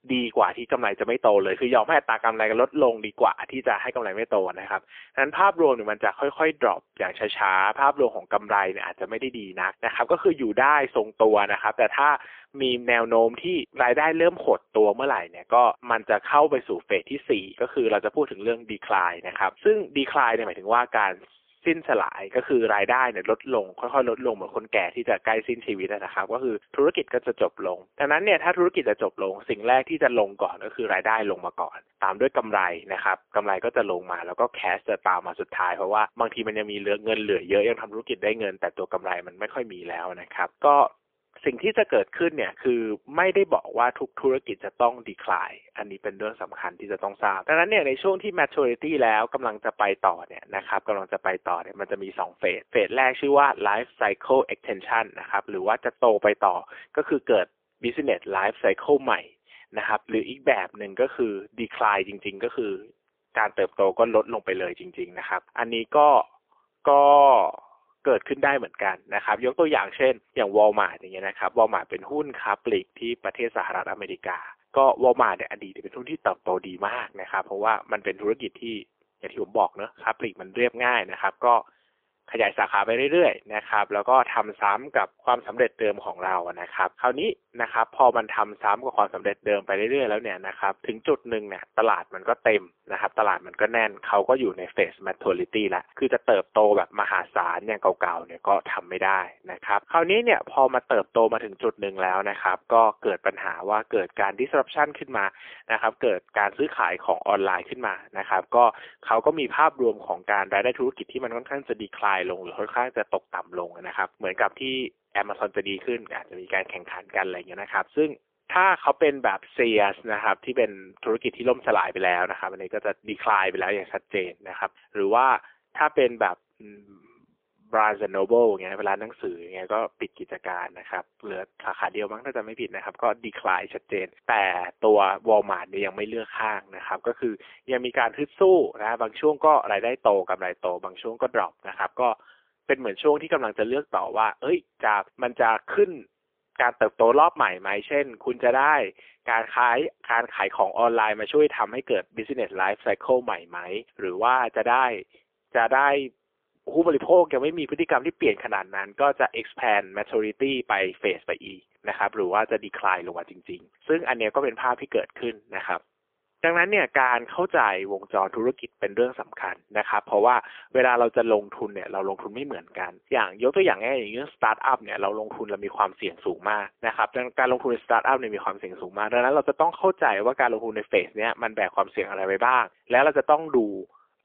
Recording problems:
phone-call audio; poor line; nothing above 3.5 kHz

